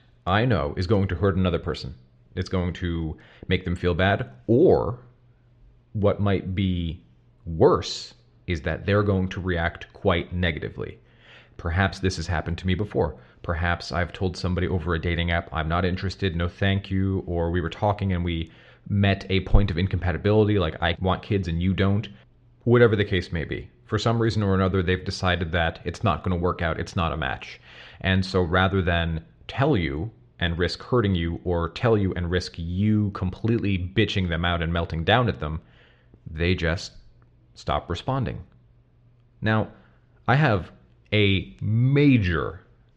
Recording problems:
muffled; slightly; fading above 4 kHz

